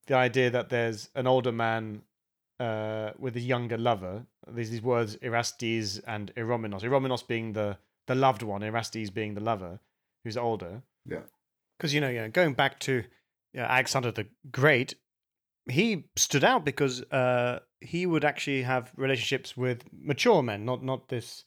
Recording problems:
none

